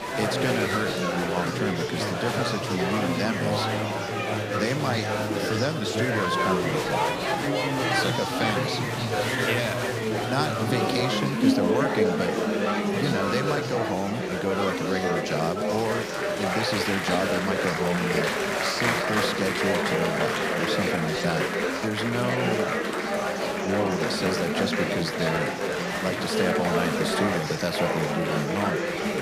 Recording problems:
chatter from many people; very loud; throughout; 4 dB above the speech

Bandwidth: 15 kHz